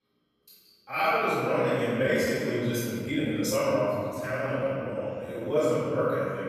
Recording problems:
room echo; strong; dies away in 2.2 s
off-mic speech; far
uneven, jittery; strongly; from 1 to 5.5 s

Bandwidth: 14 kHz